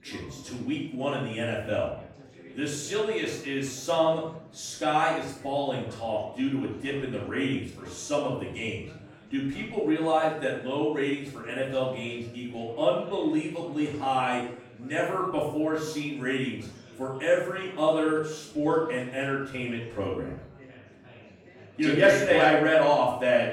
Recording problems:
off-mic speech; far
room echo; noticeable; dies away in 0.5 s
chatter from many people; faint; throughout; 20 dB below the speech

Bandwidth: 17.5 kHz